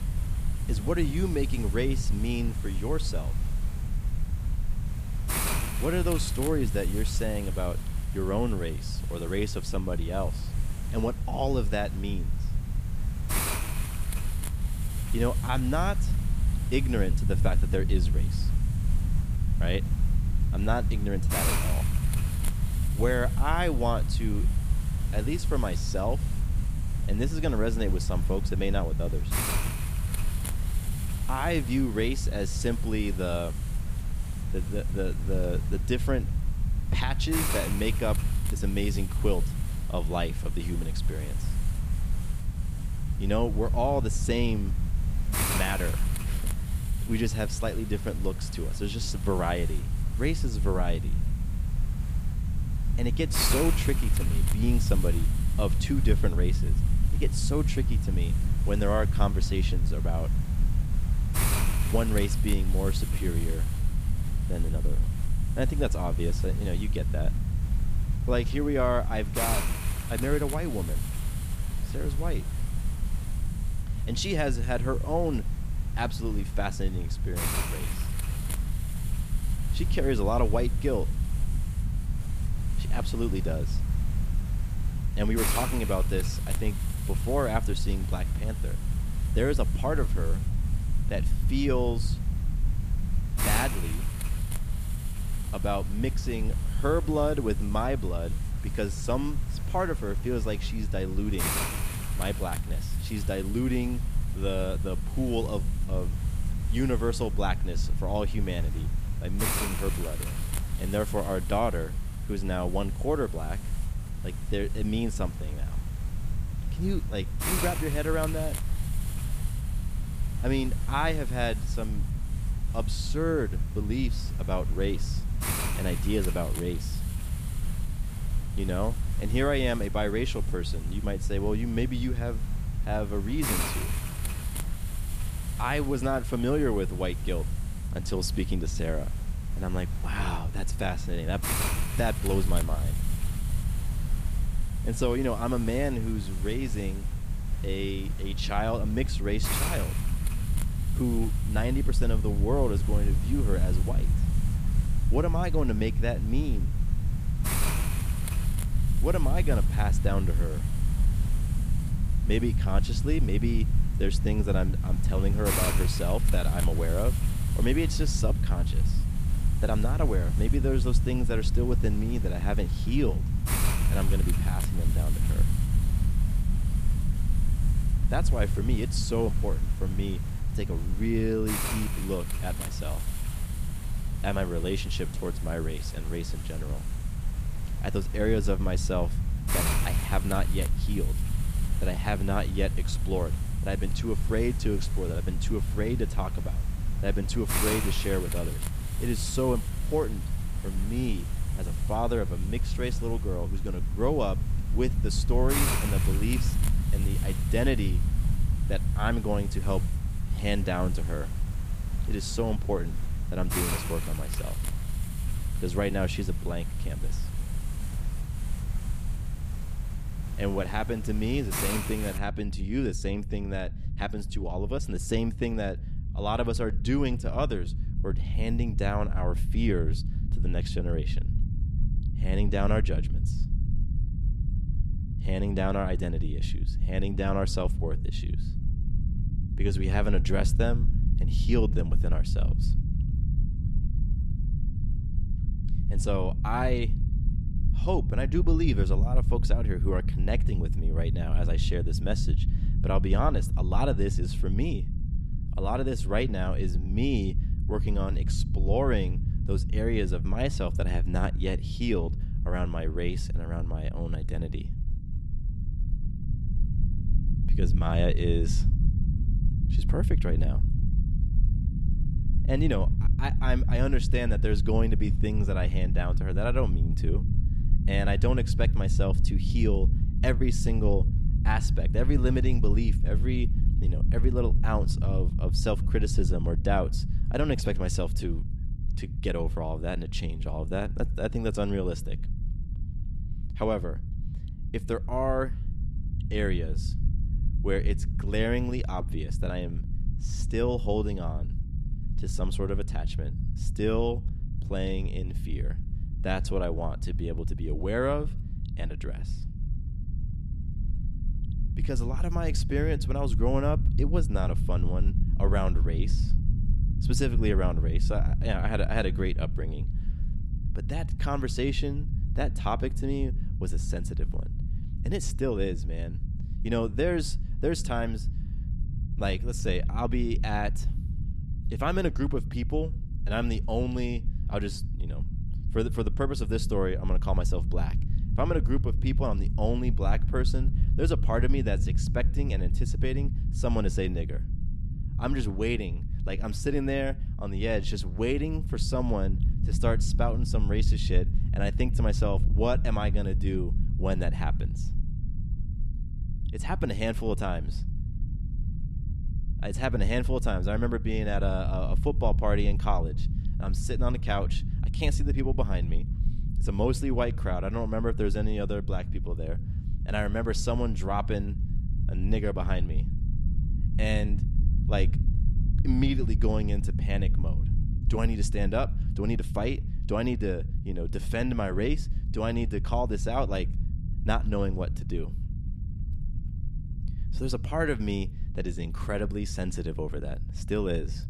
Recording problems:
hiss; loud; until 3:42; 7 dB below the speech
low rumble; noticeable; throughout; 15 dB below the speech

